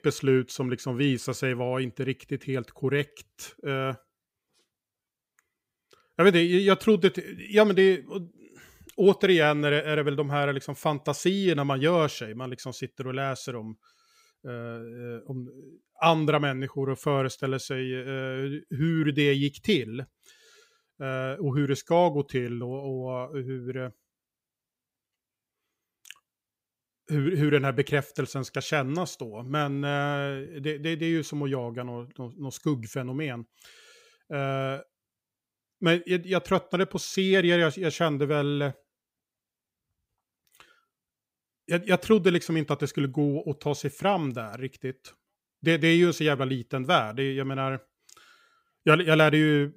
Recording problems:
none

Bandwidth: 15.5 kHz